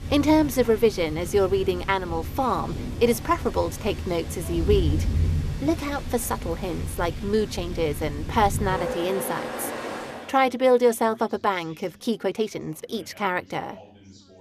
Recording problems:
rain or running water; loud; until 10 s; 7 dB below the speech
background chatter; faint; throughout; 4 voices, 25 dB below the speech
uneven, jittery; strongly; from 7 to 13 s

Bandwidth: 14.5 kHz